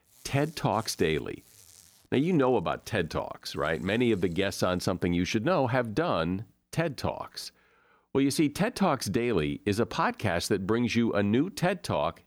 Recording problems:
household noises; faint; until 4.5 s; 30 dB below the speech

